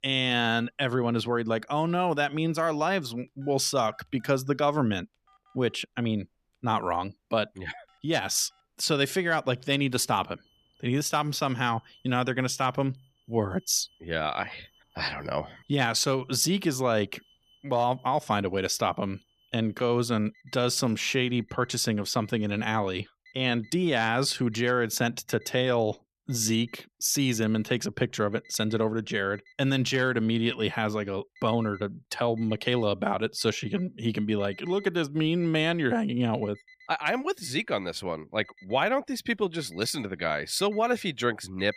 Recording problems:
alarms or sirens; faint; throughout; 30 dB below the speech

